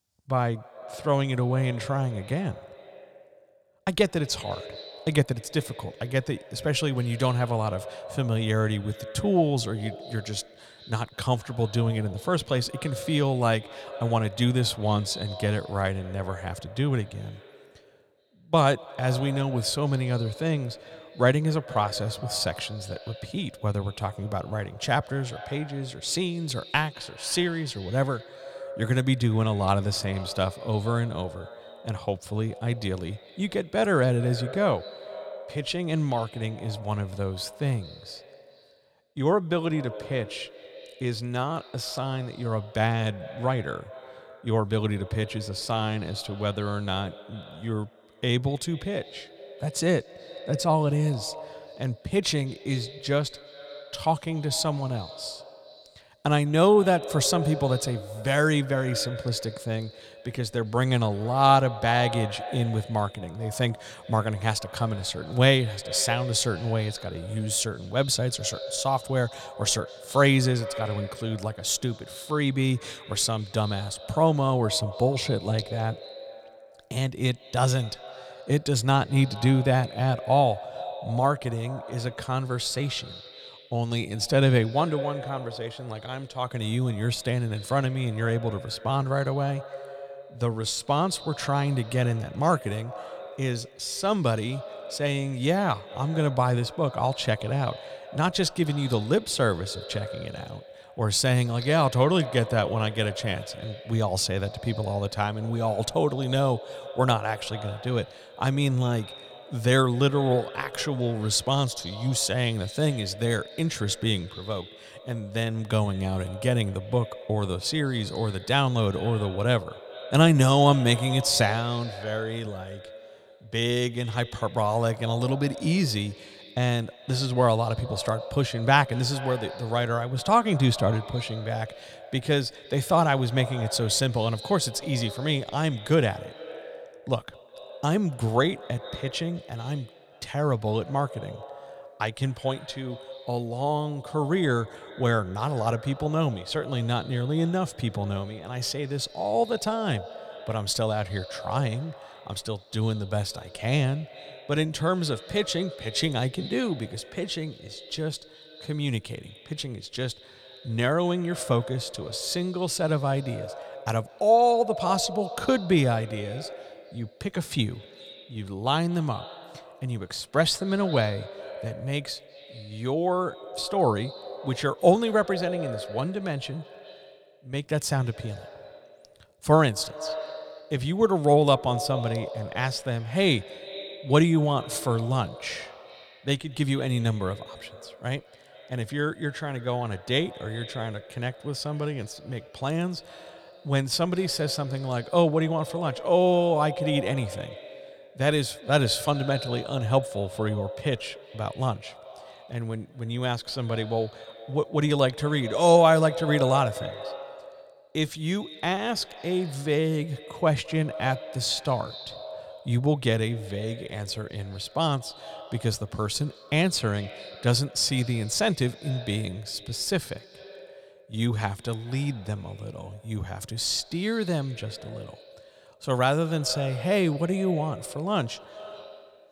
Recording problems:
echo of what is said; noticeable; throughout; 200 ms later, 15 dB below the speech

